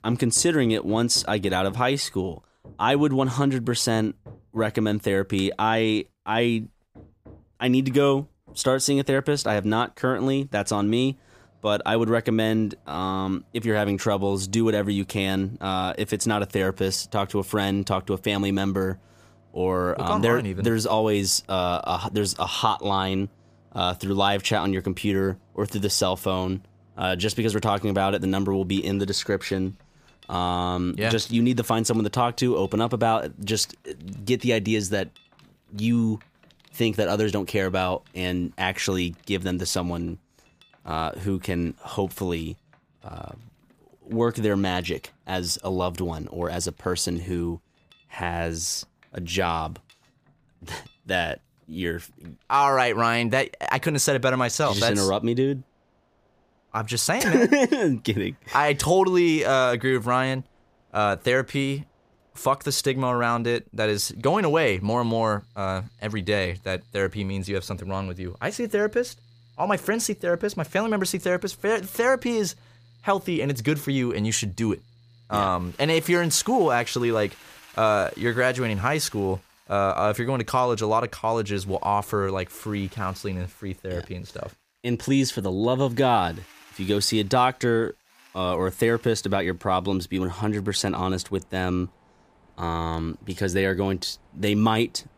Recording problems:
machinery noise; faint; throughout; 30 dB below the speech

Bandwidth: 15 kHz